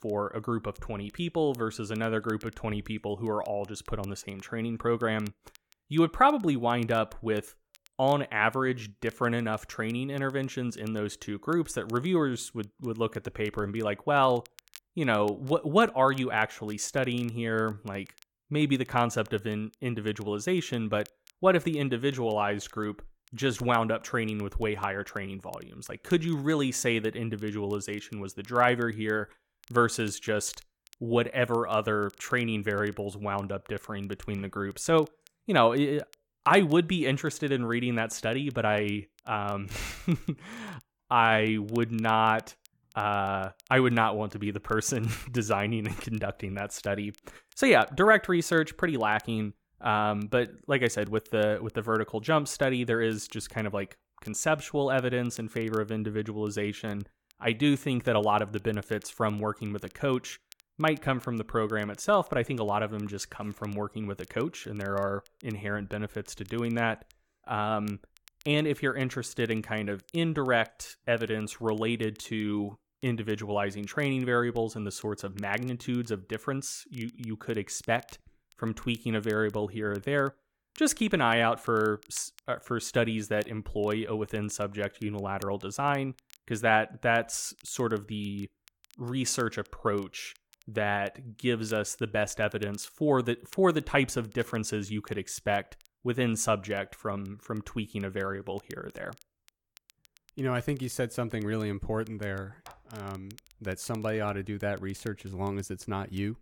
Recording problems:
crackle, like an old record; faint; 30 dB below the speech

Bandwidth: 17 kHz